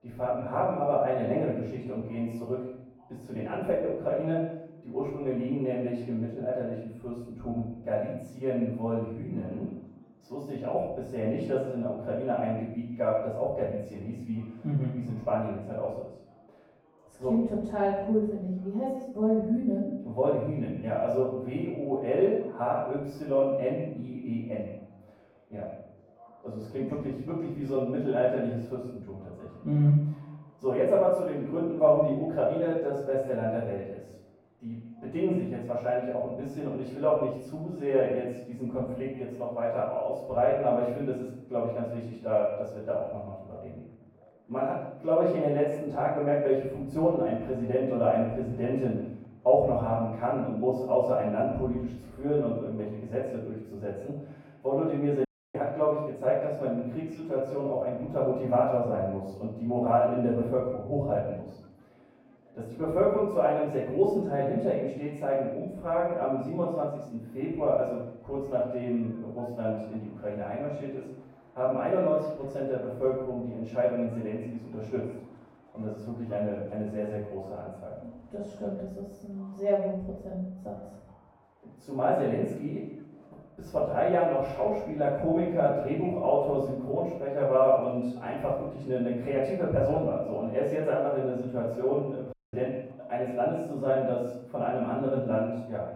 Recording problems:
echo of what is said; strong; throughout; 130 ms later, 10 dB below the speech
off-mic speech; far
muffled; very; fading above 1.5 kHz
room echo; noticeable; dies away in 0.6 s
murmuring crowd; faint; throughout; 30 dB below the speech
audio cutting out; at 55 s and at 1:32

